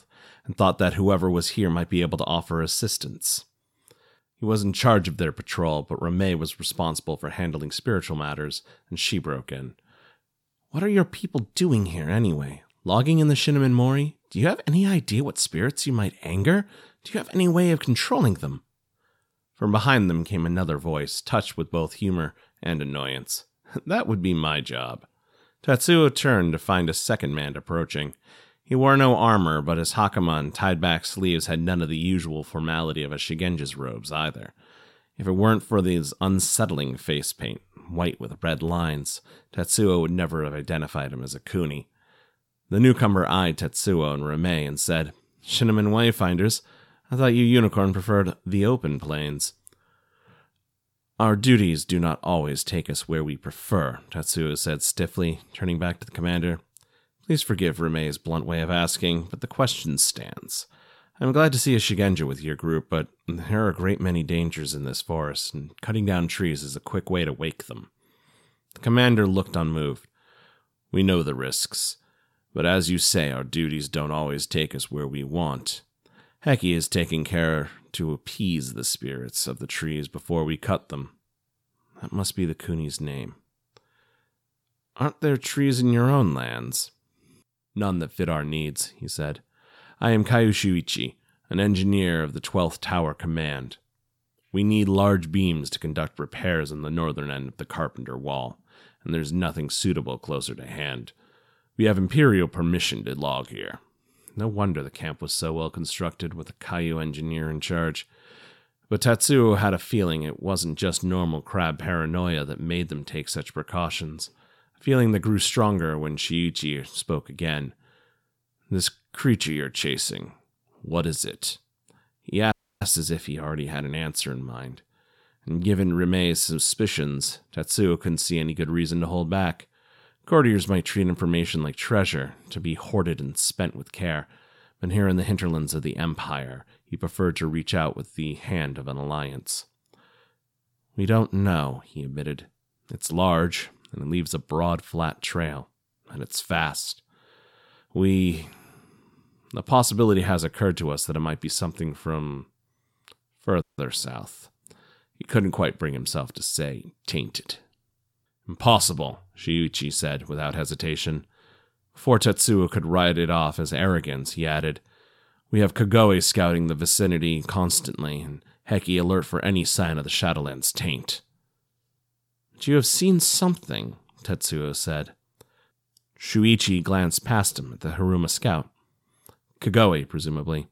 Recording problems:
audio cutting out; at 2:03 and at 2:34

